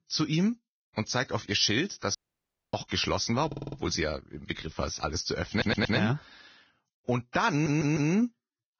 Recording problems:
garbled, watery; badly; nothing above 6 kHz
audio cutting out; at 2 s for 0.5 s
audio stuttering; at 3.5 s, at 5.5 s and at 7.5 s

